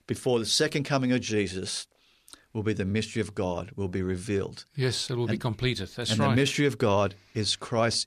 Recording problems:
none

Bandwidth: 14 kHz